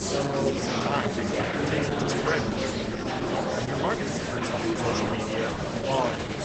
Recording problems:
garbled, watery; badly; nothing above 8 kHz
murmuring crowd; very loud; throughout; 5 dB above the speech

